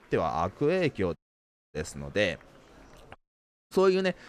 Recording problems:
murmuring crowd; faint; throughout; 25 dB below the speech
audio cutting out; at 1 s for 0.5 s and at 3 s for 0.5 s

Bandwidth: 15 kHz